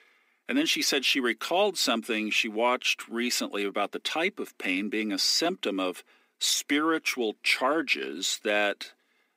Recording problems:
thin; somewhat; fading below 250 Hz

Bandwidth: 15.5 kHz